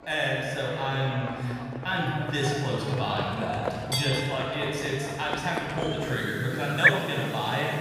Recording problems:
room echo; strong; dies away in 2.3 s
off-mic speech; far
animal sounds; very faint; throughout; 3 dB below the speech
chatter from many people; very faint; throughout; 30 dB below the speech

